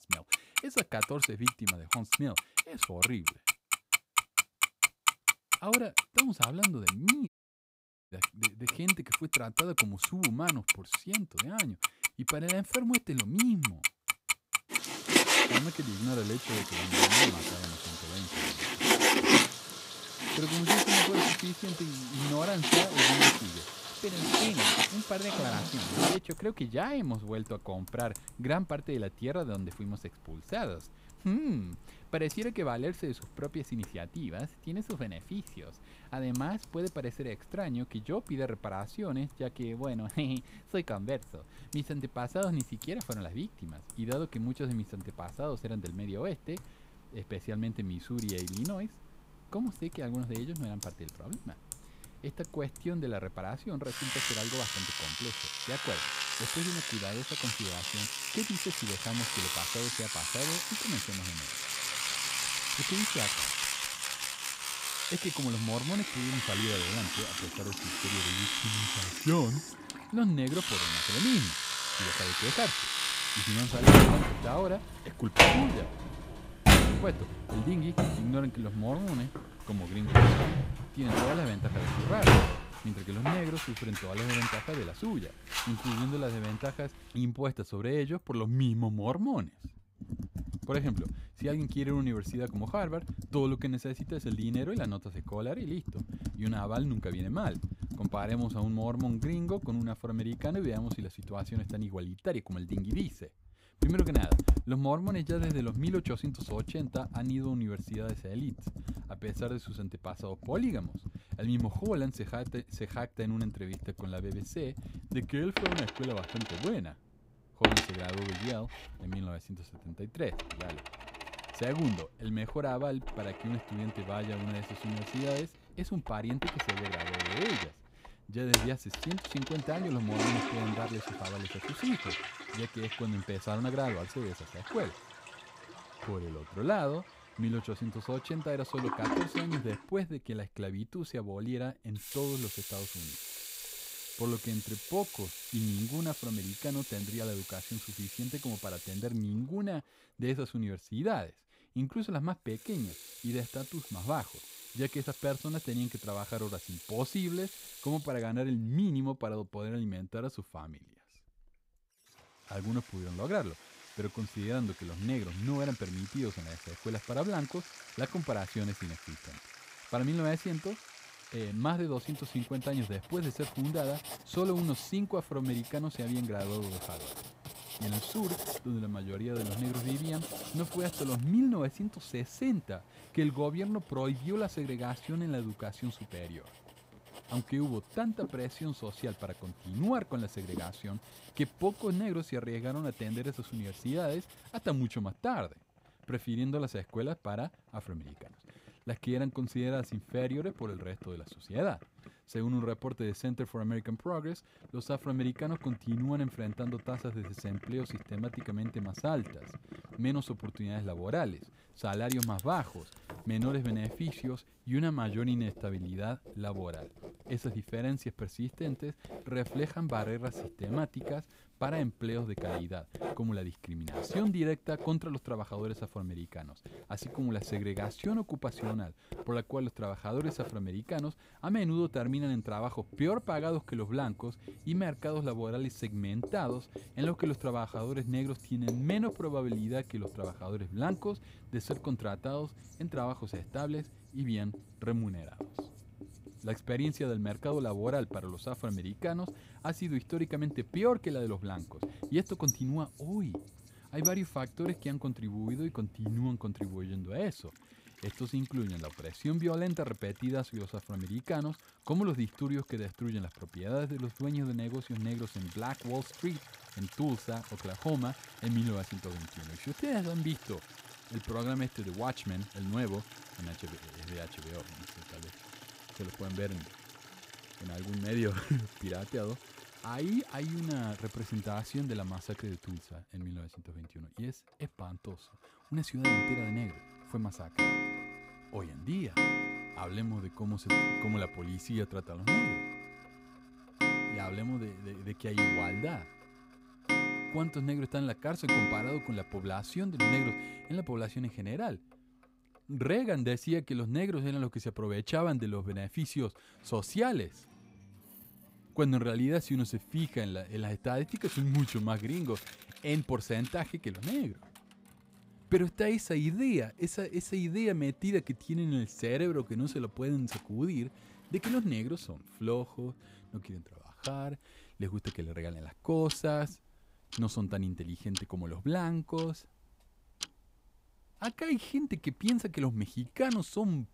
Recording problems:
household noises; very loud; throughout; 4 dB above the speech
audio cutting out; at 7.5 s for 1 s

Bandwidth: 15.5 kHz